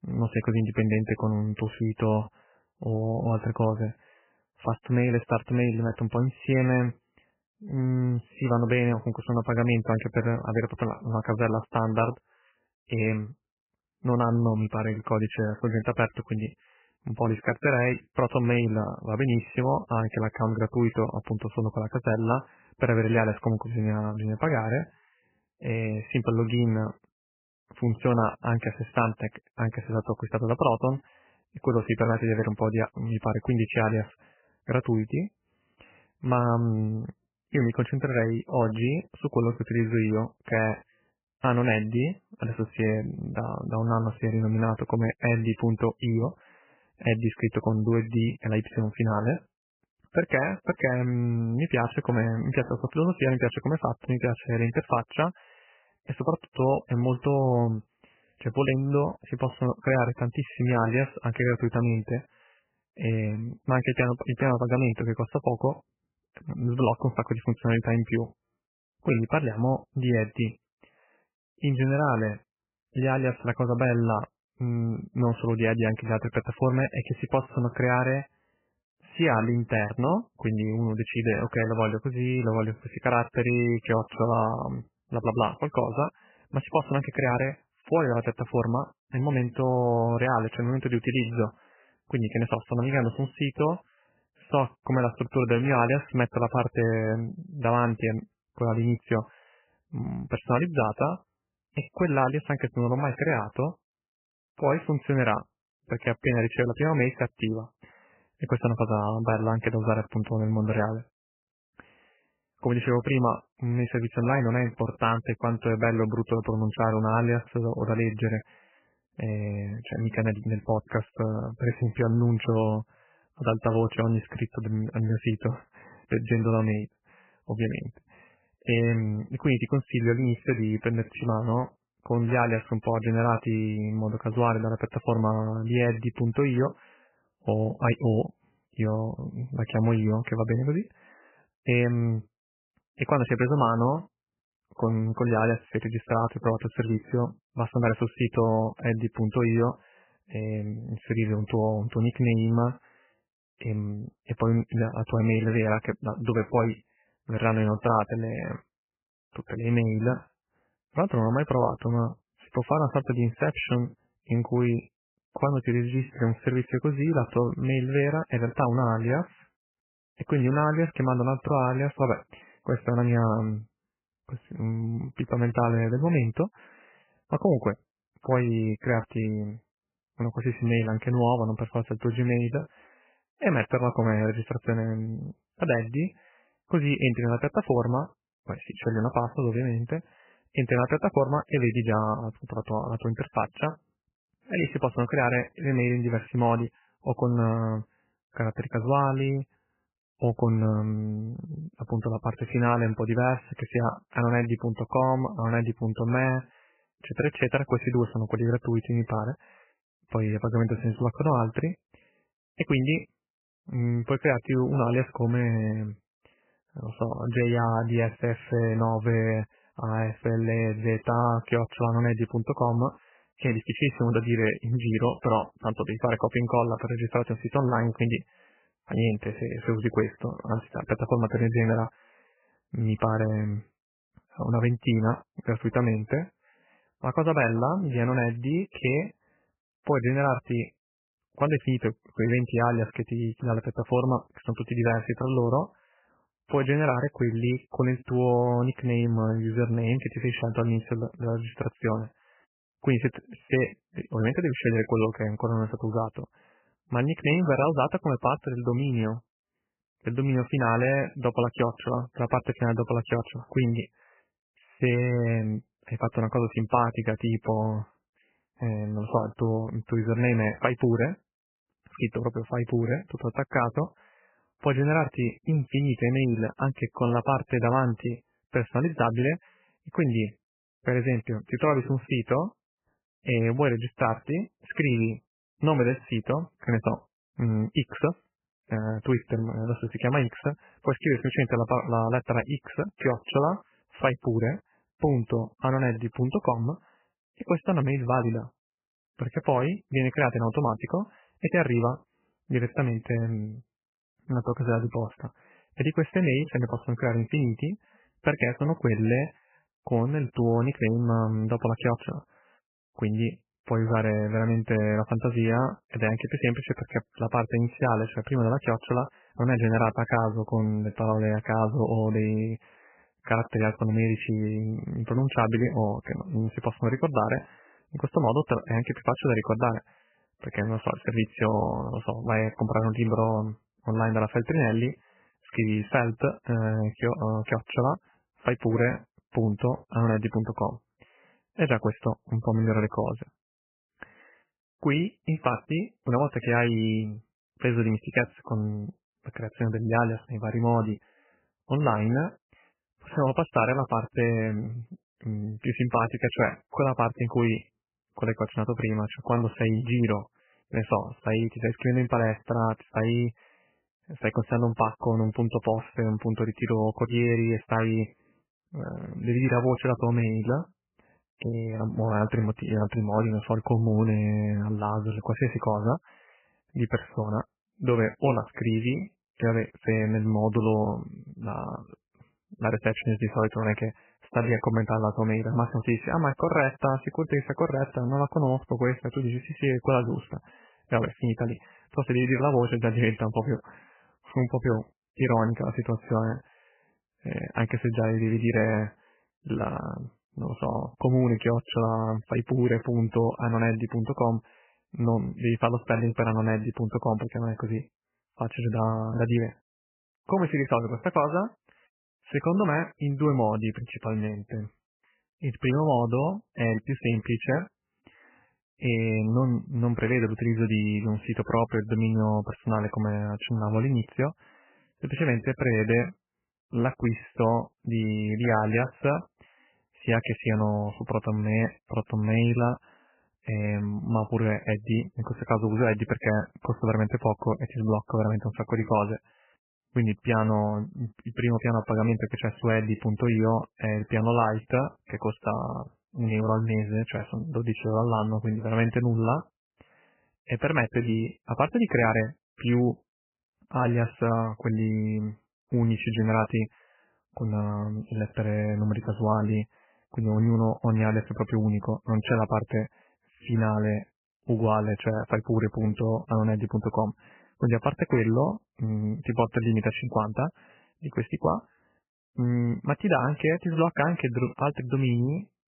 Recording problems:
garbled, watery; badly; nothing above 3 kHz

